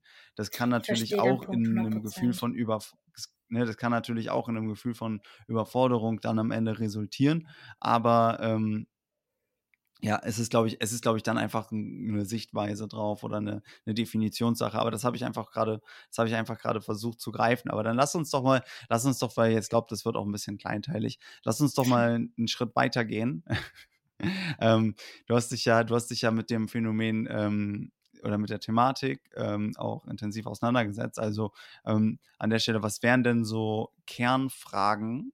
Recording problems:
none

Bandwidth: 16 kHz